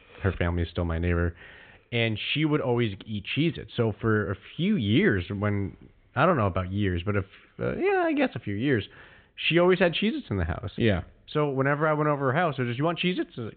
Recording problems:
high frequencies cut off; severe; nothing above 4 kHz

